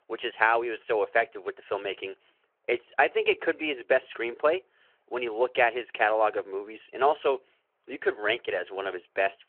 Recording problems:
phone-call audio

